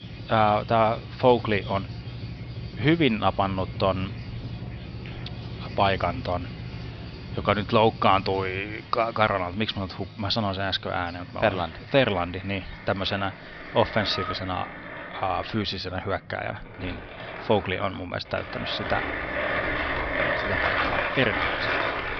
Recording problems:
high frequencies cut off; noticeable; nothing above 5.5 kHz
machinery noise; loud; throughout; 6 dB below the speech
animal sounds; noticeable; throughout; 20 dB below the speech

